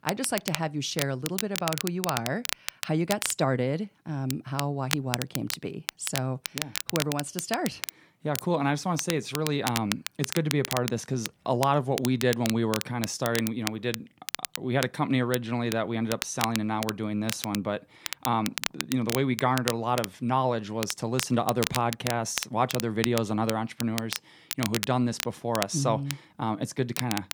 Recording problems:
crackle, like an old record; loud; 6 dB below the speech

